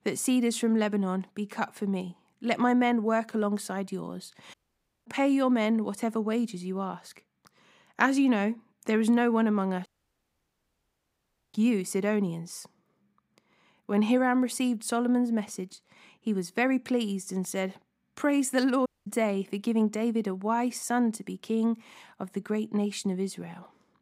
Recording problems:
audio cutting out; at 4.5 s for 0.5 s, at 10 s for 1.5 s and at 19 s

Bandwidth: 15.5 kHz